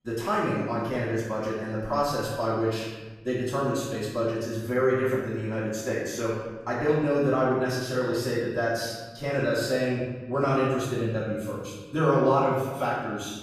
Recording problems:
room echo; strong; dies away in 1.3 s
off-mic speech; far

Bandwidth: 14.5 kHz